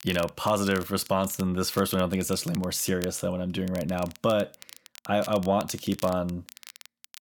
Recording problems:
crackle, like an old record; noticeable; 20 dB below the speech

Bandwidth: 18.5 kHz